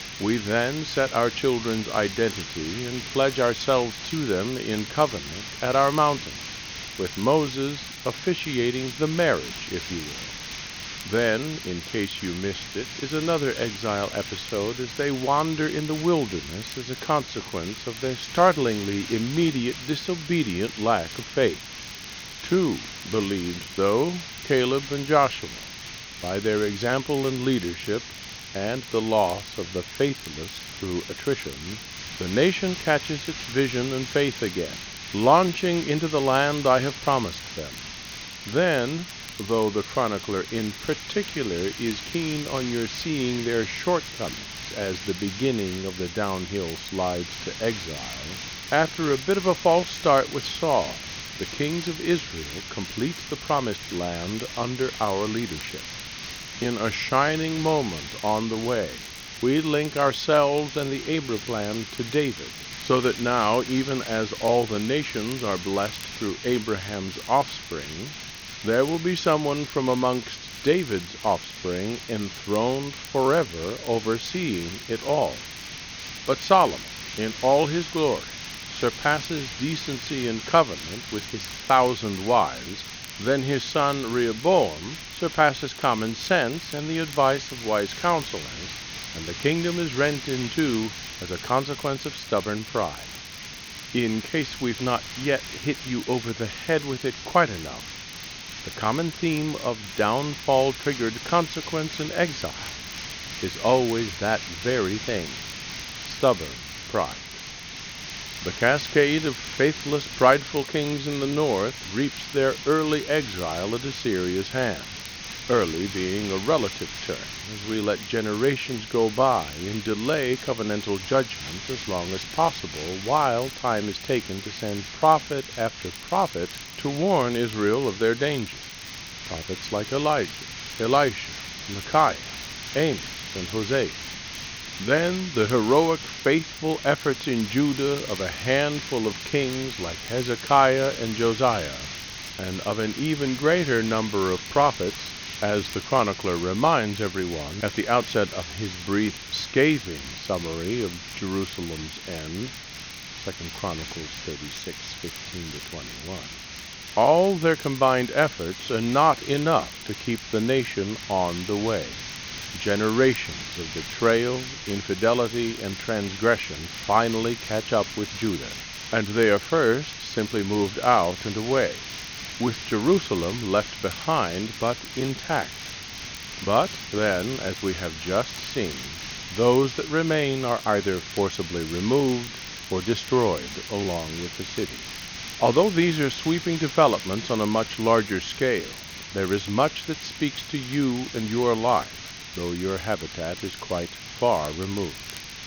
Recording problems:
high frequencies cut off; noticeable; nothing above 6.5 kHz
hiss; loud; throughout; 10 dB below the speech
crackle, like an old record; faint; 25 dB below the speech

